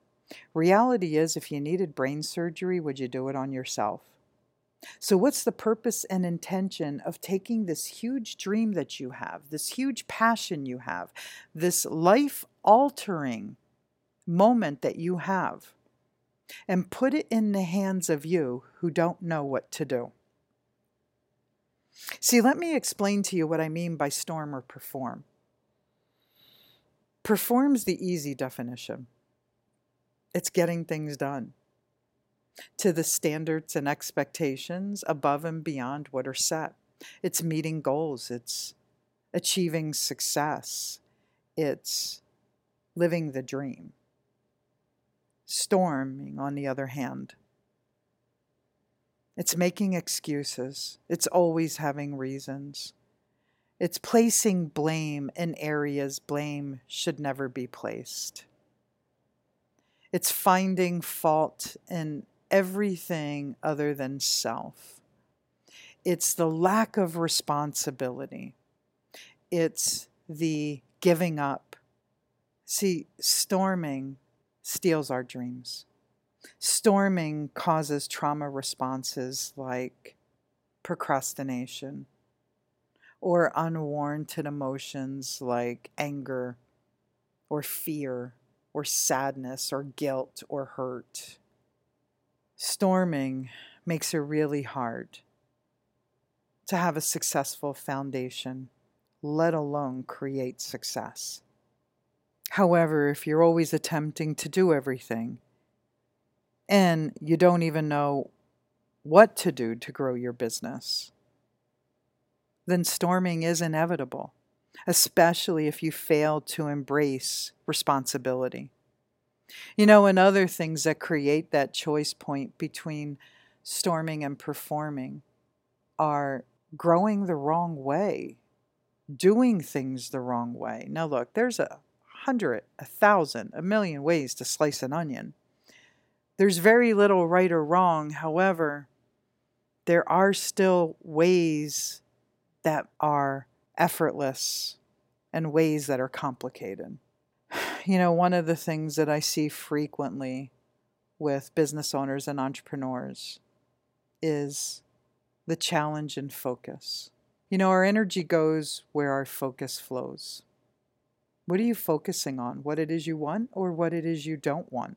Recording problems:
none

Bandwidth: 16.5 kHz